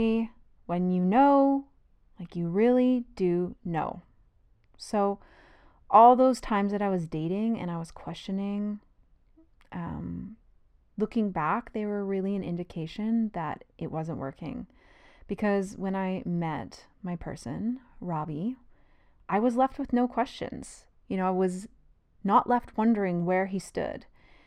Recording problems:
muffled; slightly; fading above 2 kHz
abrupt cut into speech; at the start

